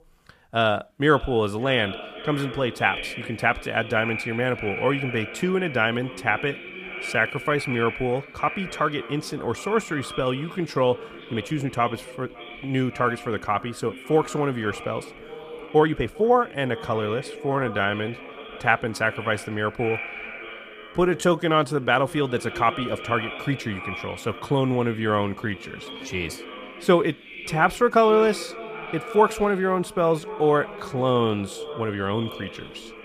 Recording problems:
echo of what is said; strong; throughout; 560 ms later, 10 dB below the speech
uneven, jittery; strongly; from 7 to 32 s

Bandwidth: 14.5 kHz